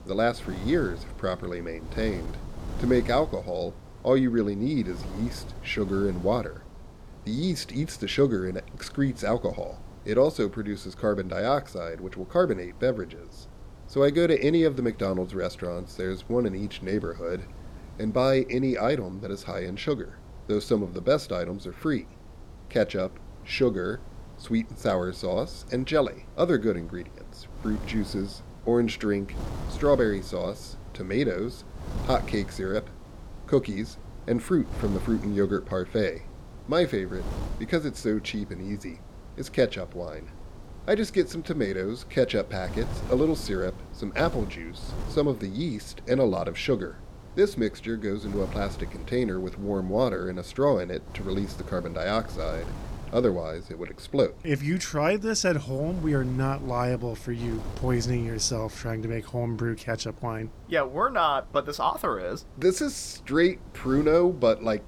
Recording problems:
wind noise on the microphone; occasional gusts; 20 dB below the speech

